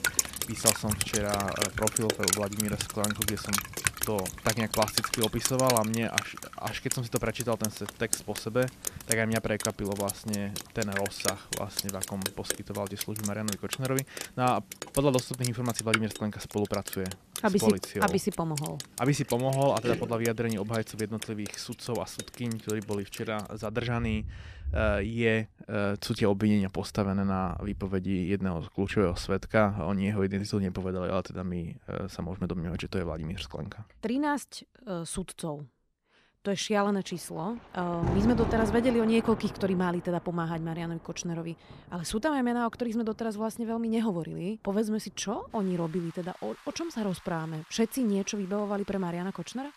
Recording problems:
rain or running water; loud; throughout; 3 dB below the speech

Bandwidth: 14.5 kHz